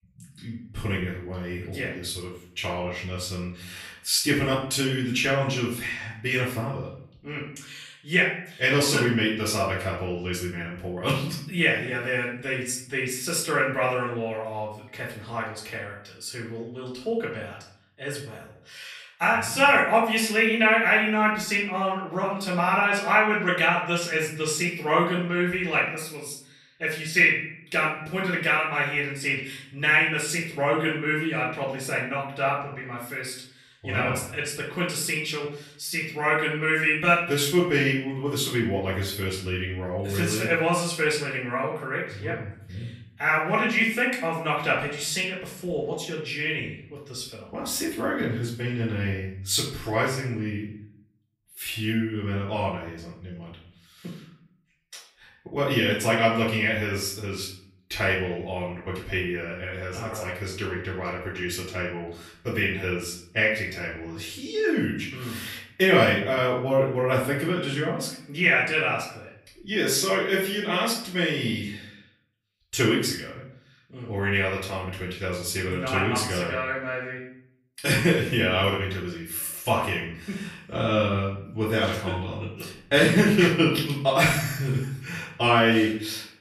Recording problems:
off-mic speech; far
room echo; noticeable; dies away in 0.5 s

